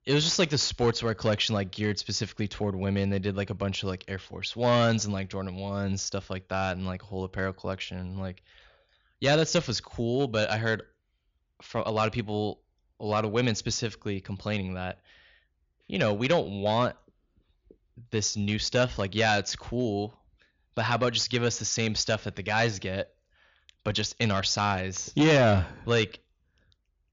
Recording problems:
high frequencies cut off; noticeable; nothing above 7 kHz
distortion; slight; 2% of the sound clipped

